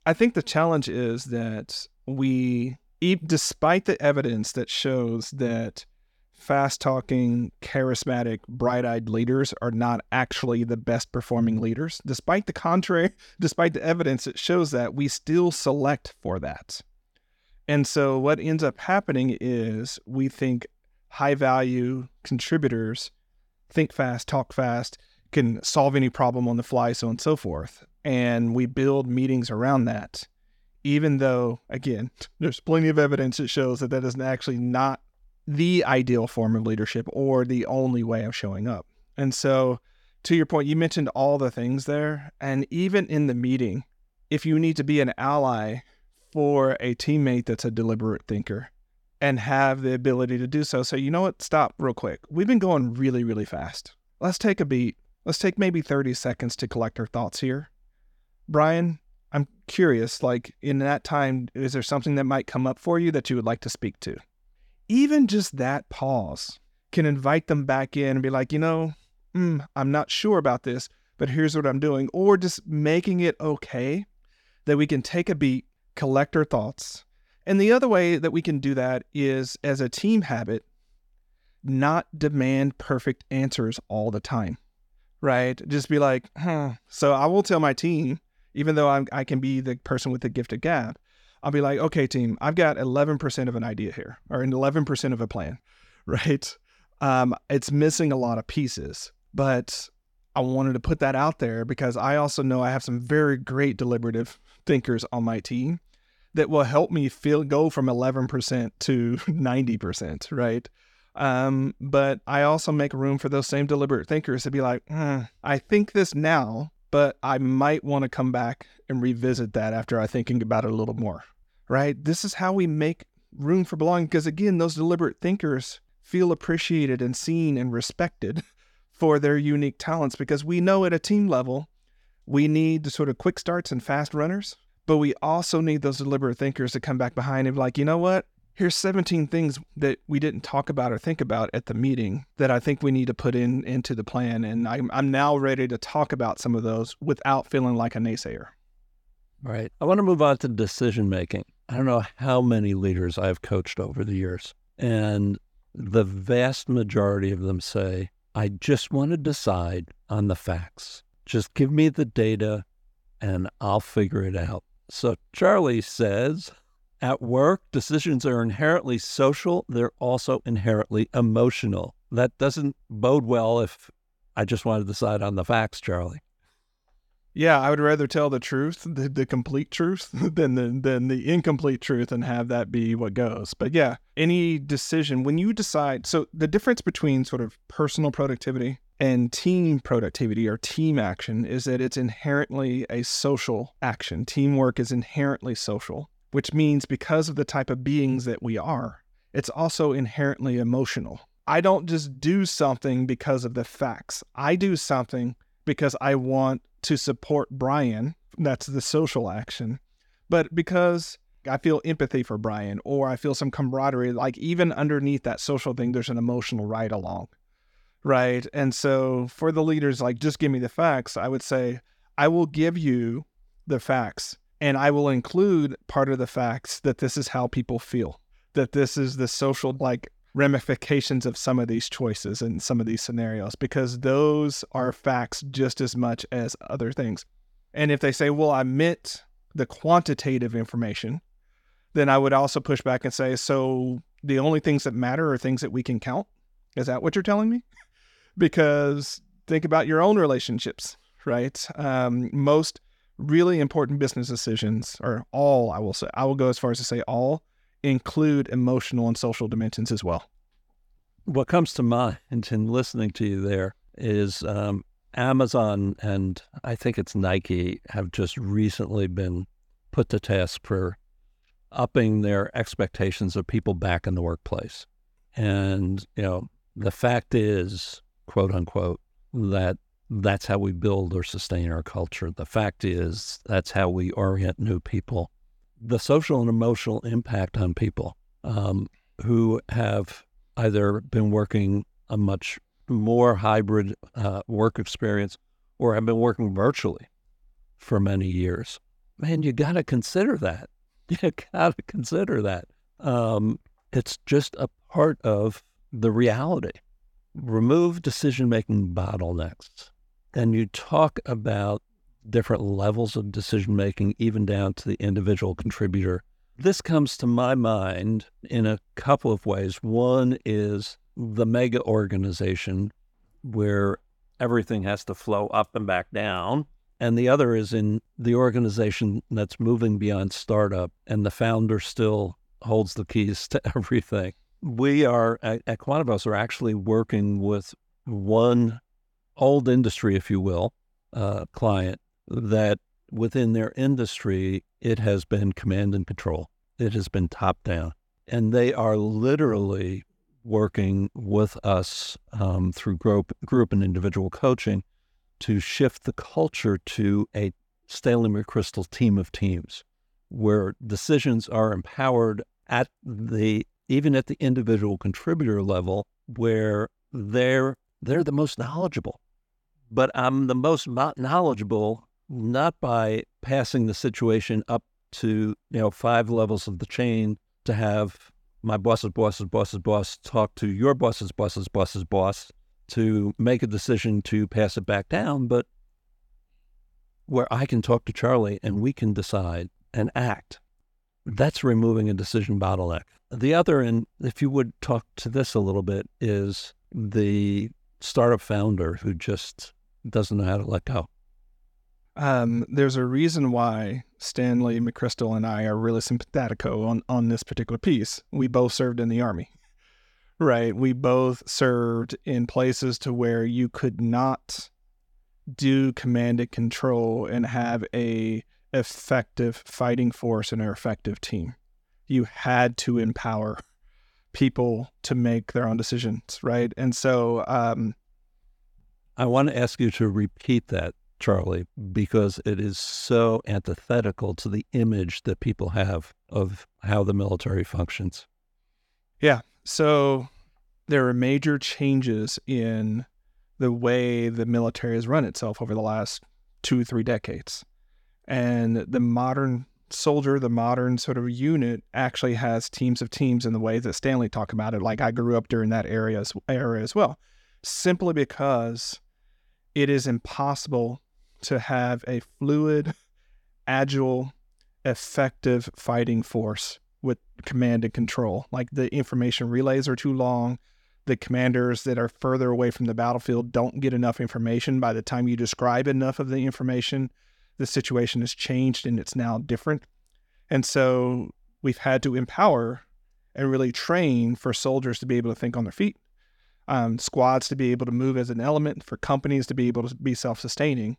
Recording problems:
none

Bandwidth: 18 kHz